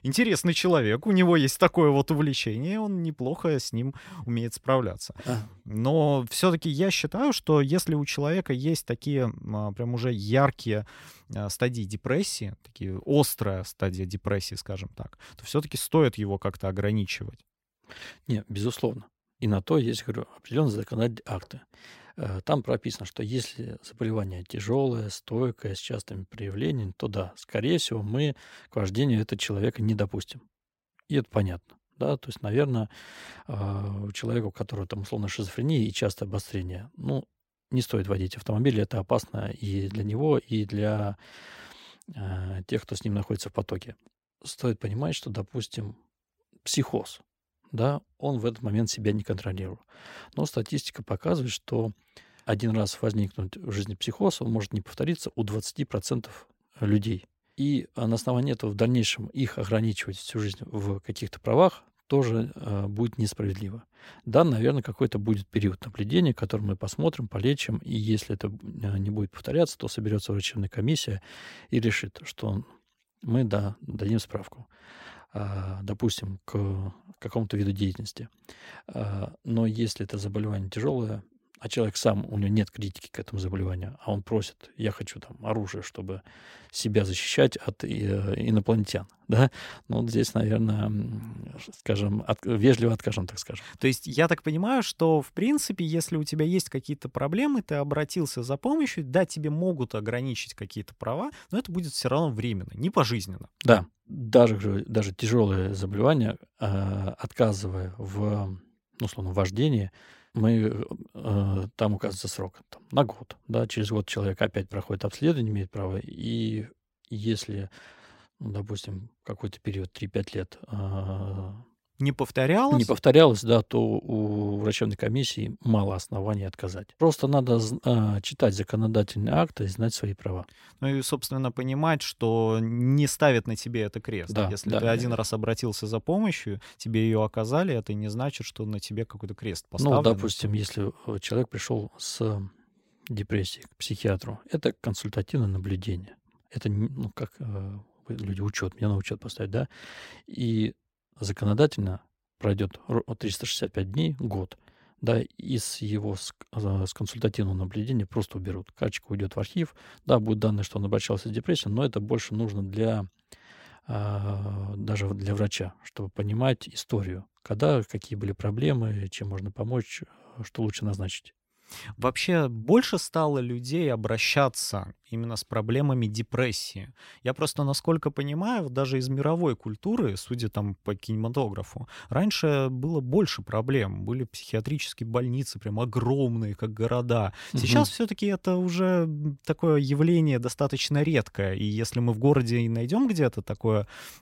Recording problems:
none

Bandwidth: 16 kHz